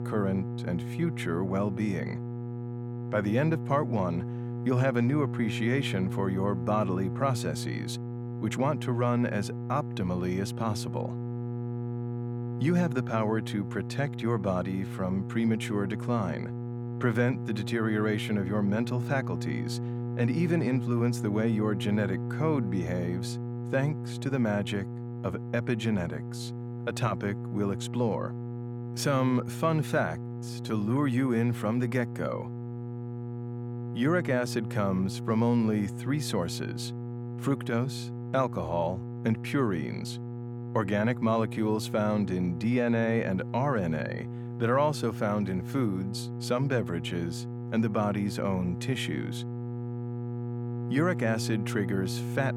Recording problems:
electrical hum; noticeable; throughout; 60 Hz, 10 dB below the speech

